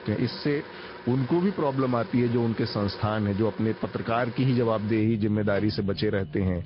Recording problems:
high frequencies cut off; noticeable; nothing above 5 kHz
garbled, watery; slightly
household noises; noticeable; throughout; 15 dB below the speech

